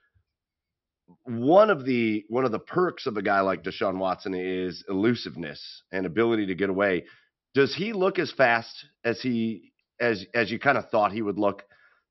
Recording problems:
high frequencies cut off; noticeable; nothing above 5.5 kHz

